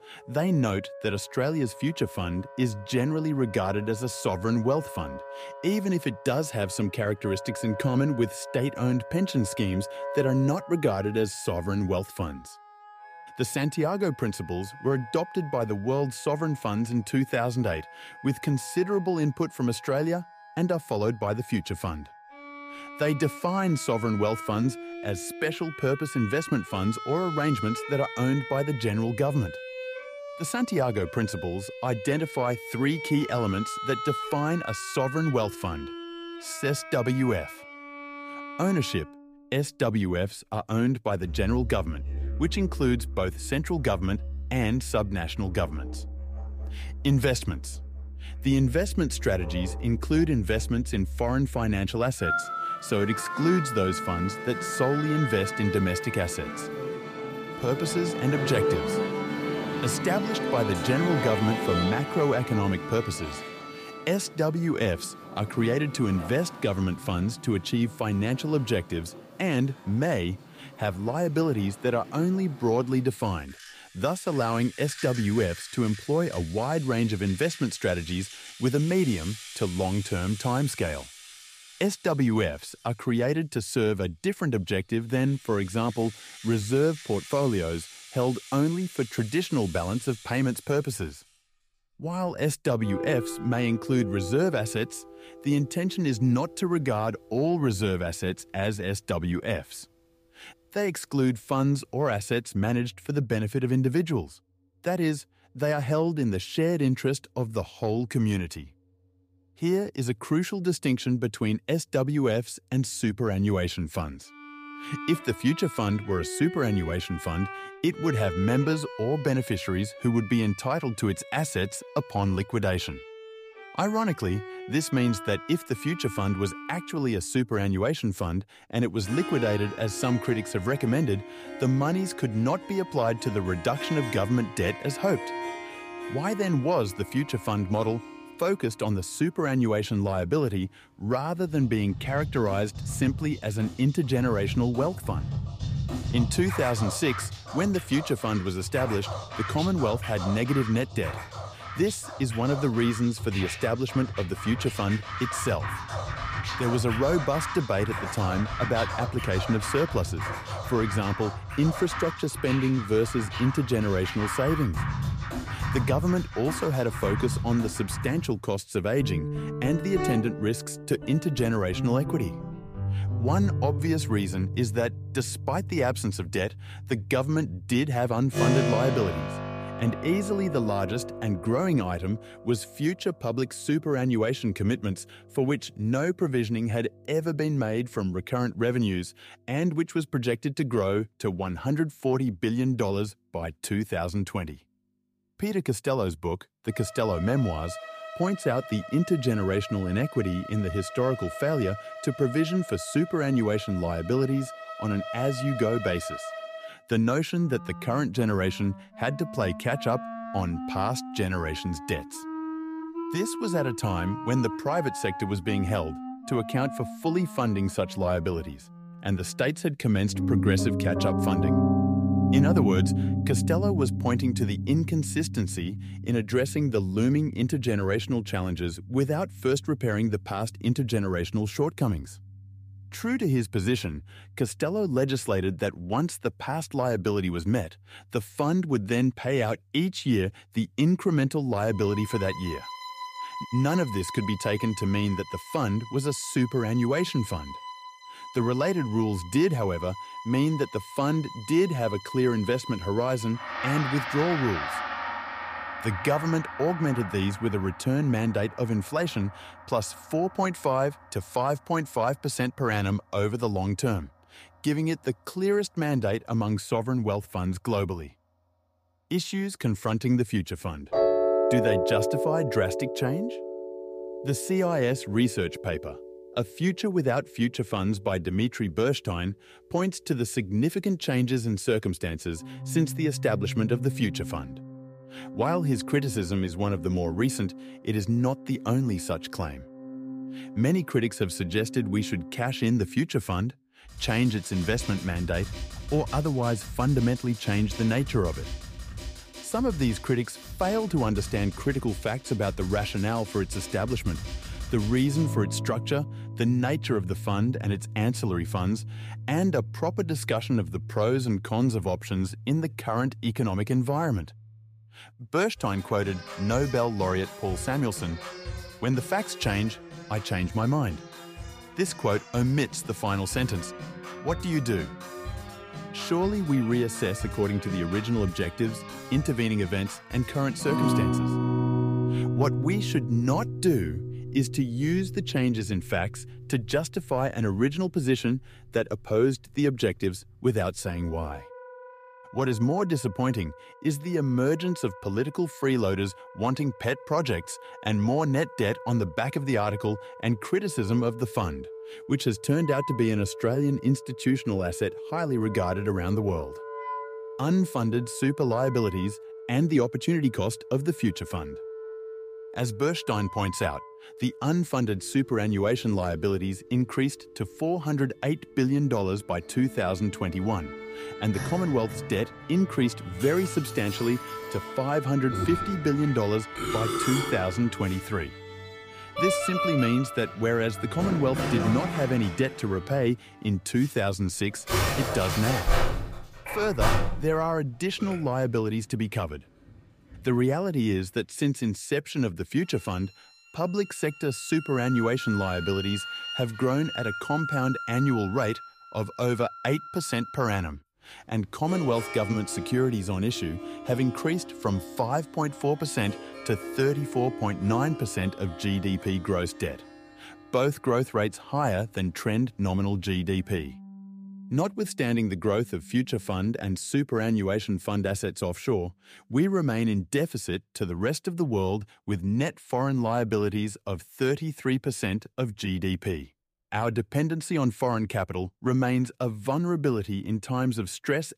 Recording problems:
background music; loud; throughout; 8 dB below the speech

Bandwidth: 15 kHz